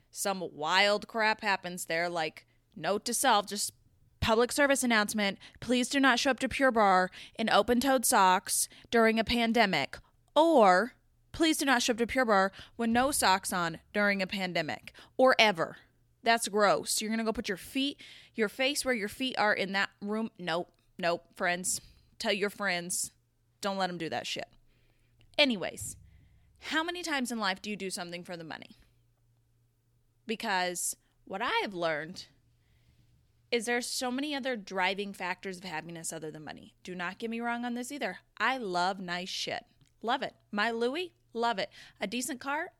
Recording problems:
none

